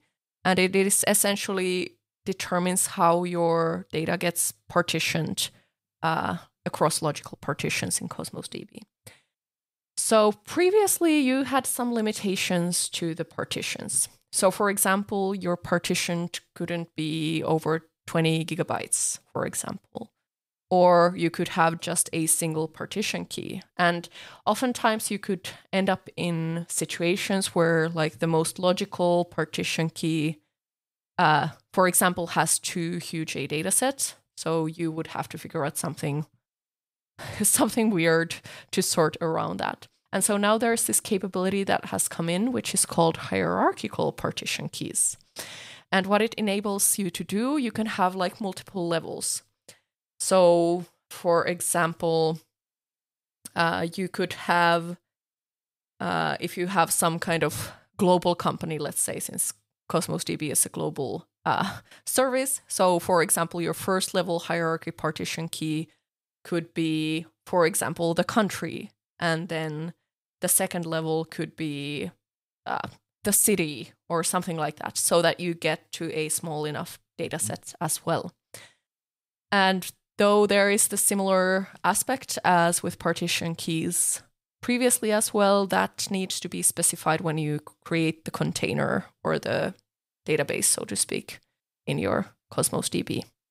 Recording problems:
none

